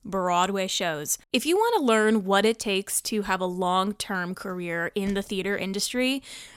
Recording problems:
none

